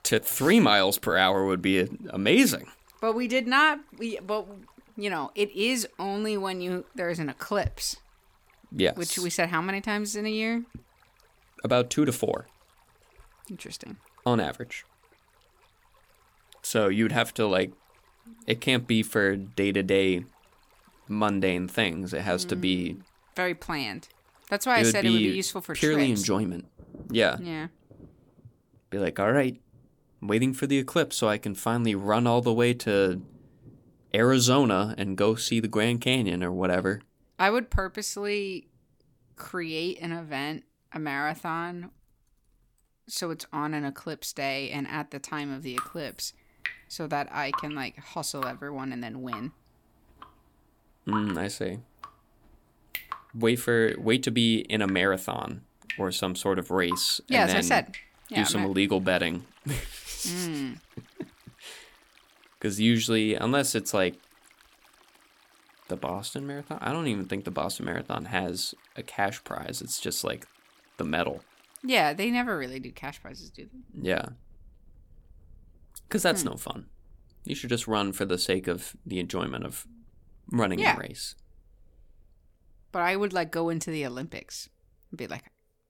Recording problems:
rain or running water; noticeable; throughout; 20 dB below the speech

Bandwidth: 18.5 kHz